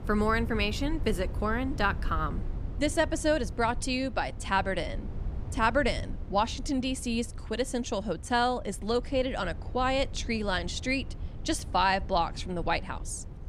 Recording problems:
low rumble; faint; throughout; 20 dB below the speech

